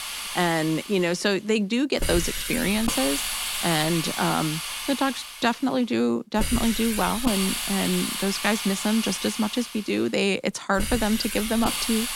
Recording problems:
hiss; loud; throughout; 3 dB below the speech

